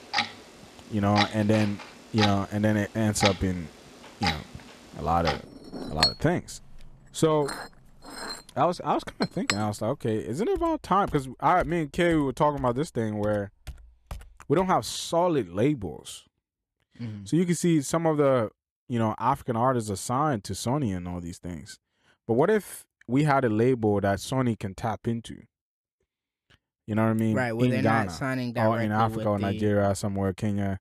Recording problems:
household noises; loud; until 15 s; 5 dB below the speech

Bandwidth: 14 kHz